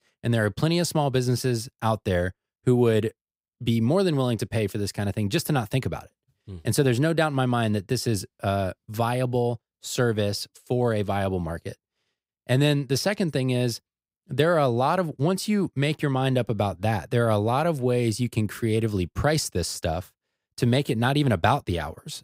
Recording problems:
none

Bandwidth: 15.5 kHz